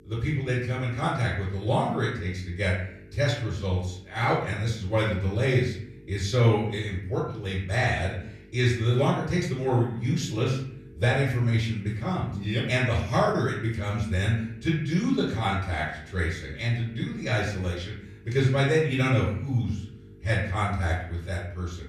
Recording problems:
off-mic speech; far
room echo; noticeable; dies away in 0.6 s
electrical hum; faint; throughout; 50 Hz, 25 dB below the speech

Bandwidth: 14.5 kHz